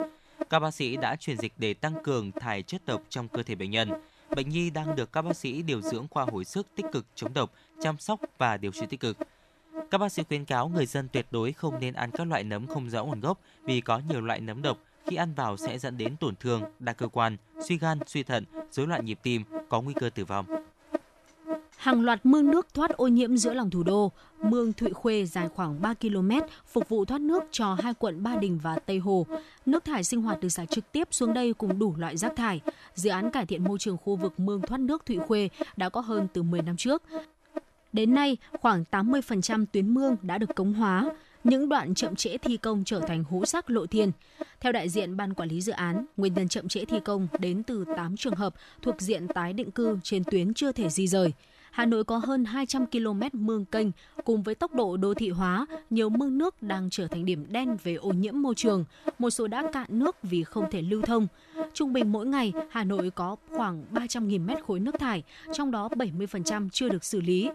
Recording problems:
electrical hum; loud; throughout; 60 Hz, 9 dB below the speech

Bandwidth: 13.5 kHz